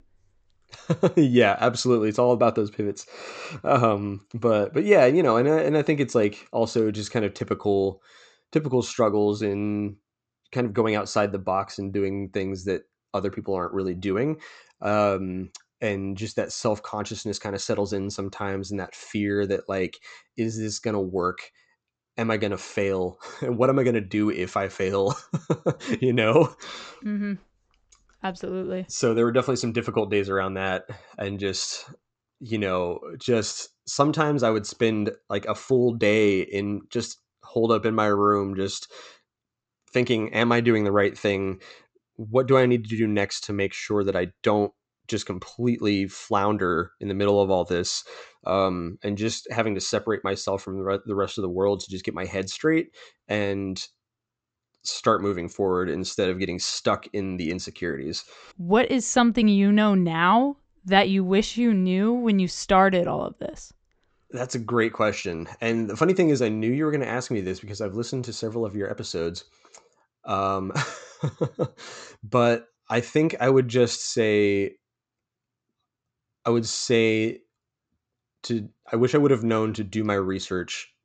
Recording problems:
high frequencies cut off; noticeable; nothing above 8 kHz

